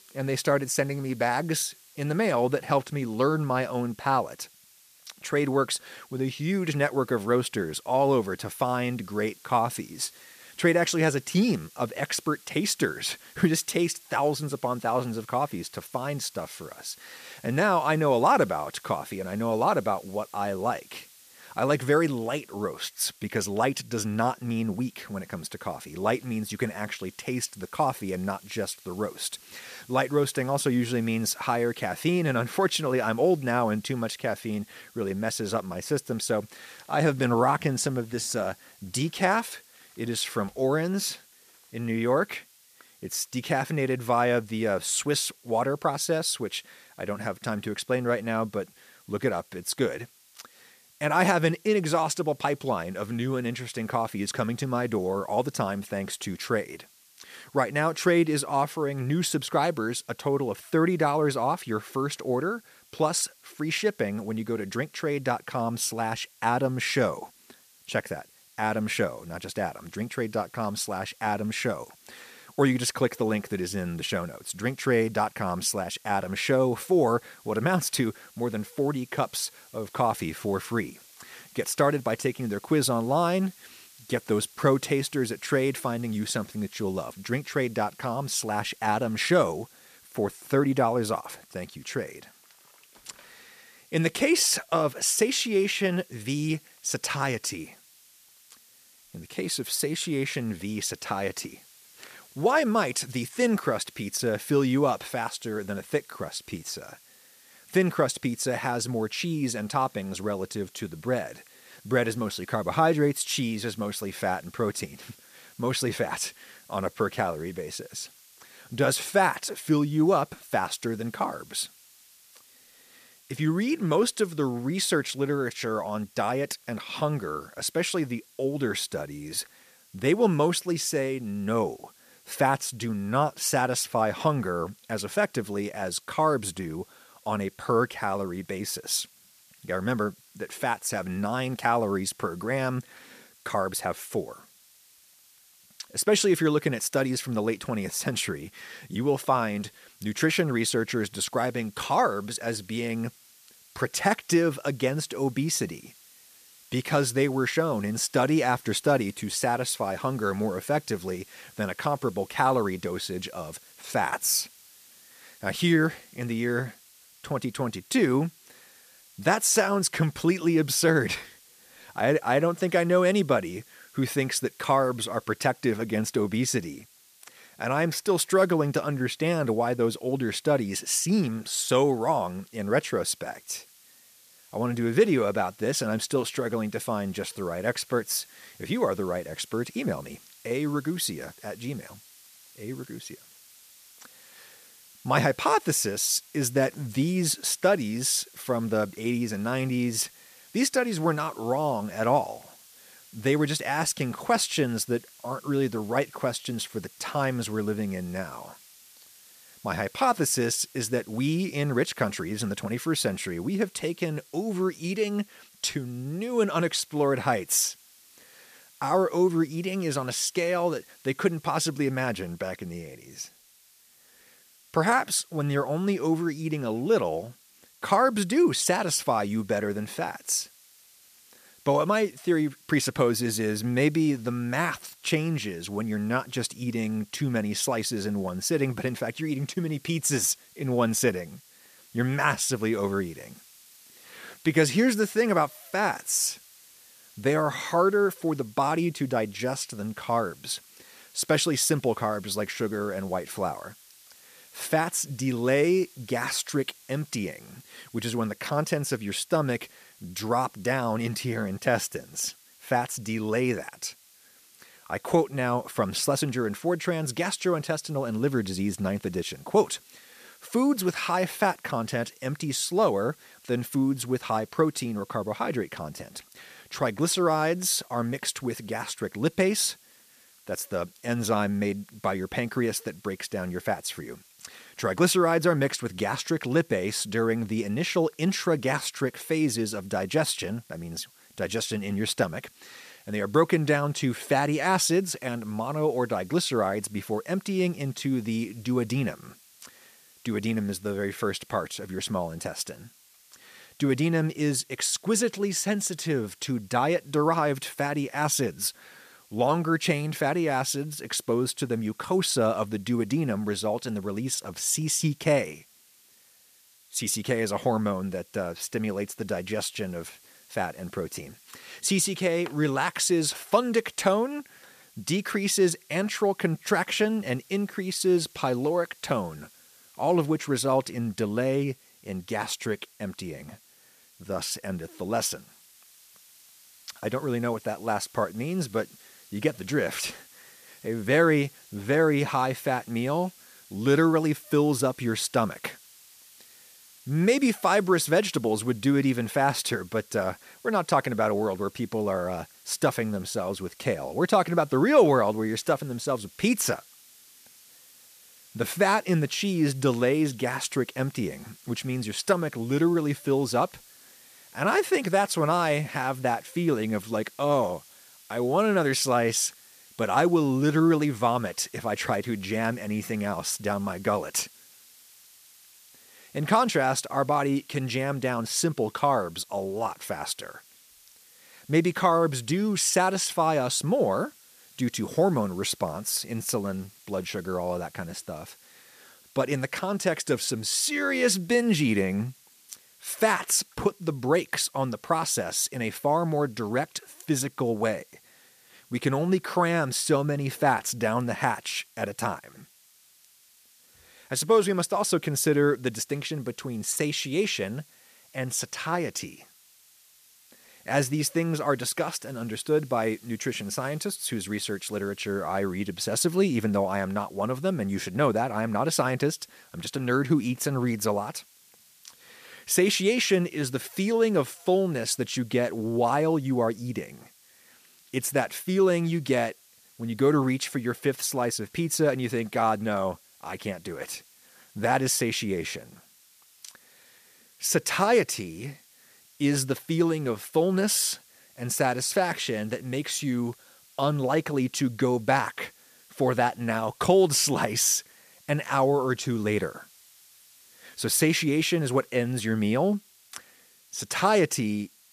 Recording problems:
hiss; faint; throughout; 25 dB below the speech

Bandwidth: 14.5 kHz